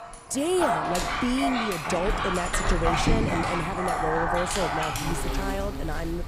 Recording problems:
animal sounds; very loud; throughout; 2 dB above the speech

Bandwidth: 15 kHz